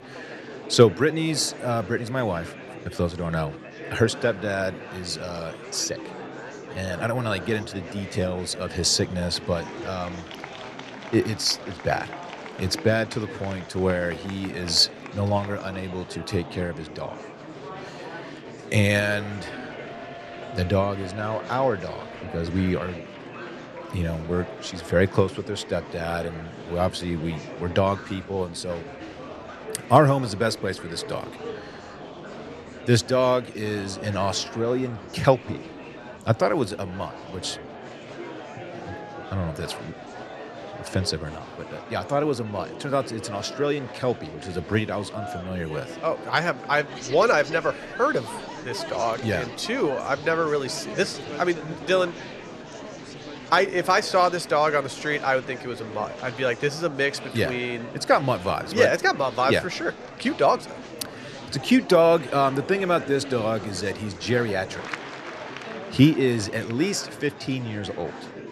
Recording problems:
murmuring crowd; noticeable; throughout; 15 dB below the speech

